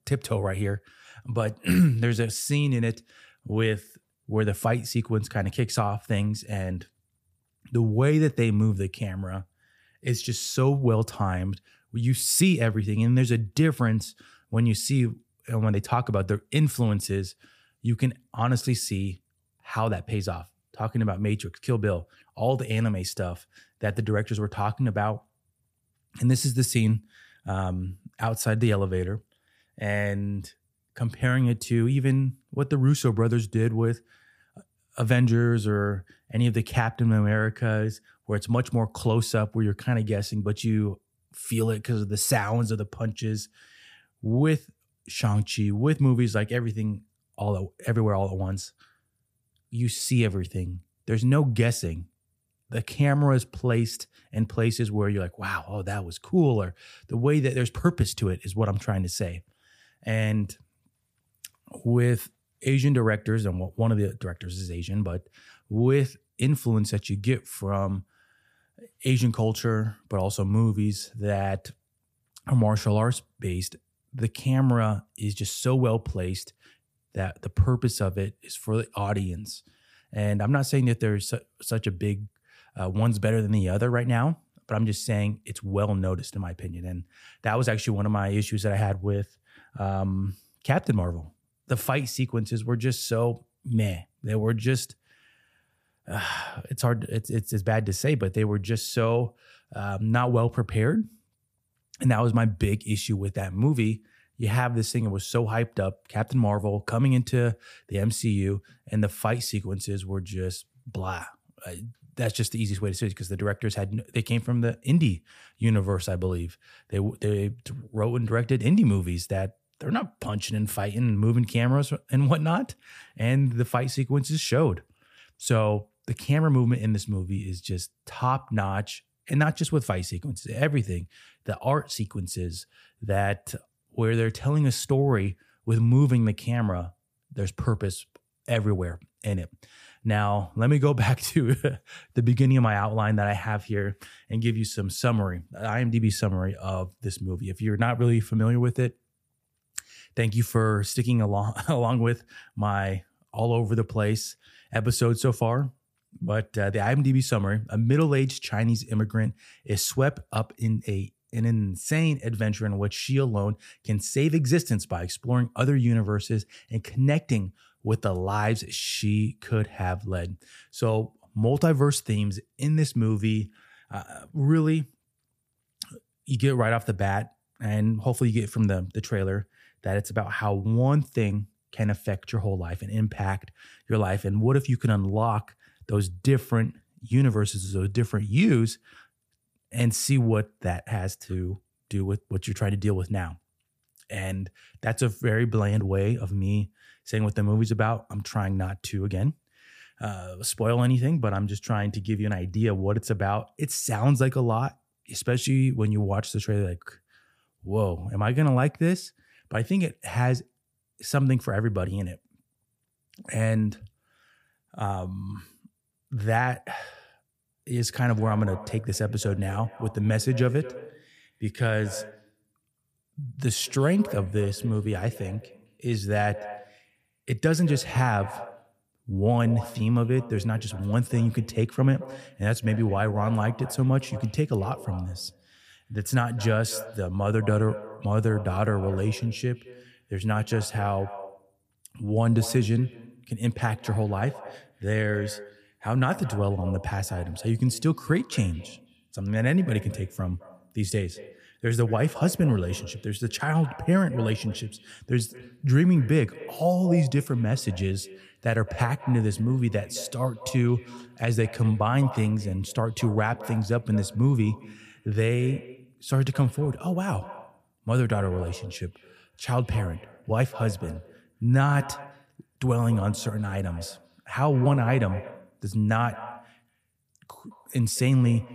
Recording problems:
echo of what is said; noticeable; from 3:37 on; 210 ms later, 15 dB below the speech

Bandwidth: 15 kHz